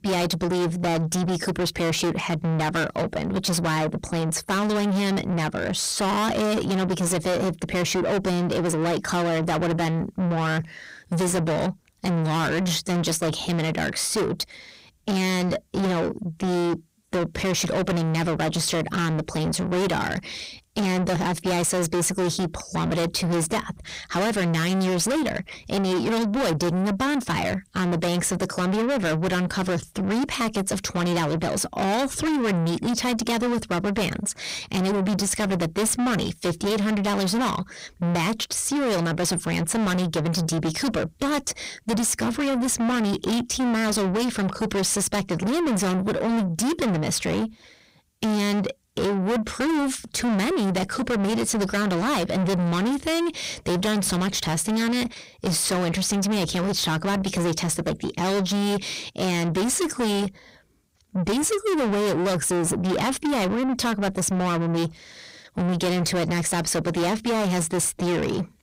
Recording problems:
distortion; heavy; 6 dB below the speech

